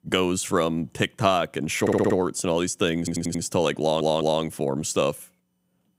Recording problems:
audio stuttering; at 2 s, at 3 s and at 4 s

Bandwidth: 15.5 kHz